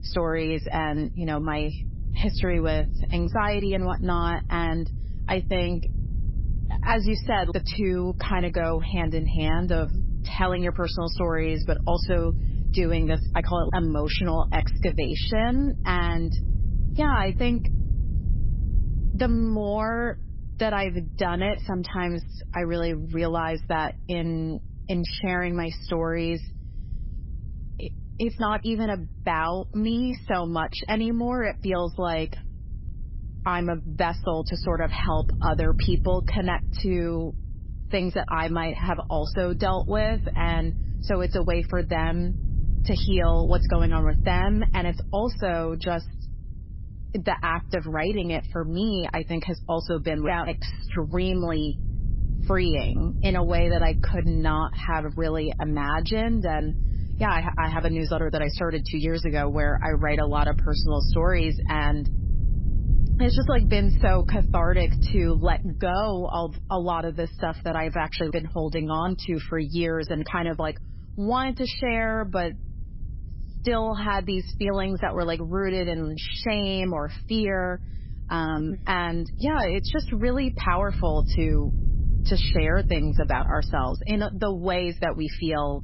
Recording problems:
garbled, watery; badly; nothing above 5.5 kHz
low rumble; noticeable; throughout; 20 dB below the speech

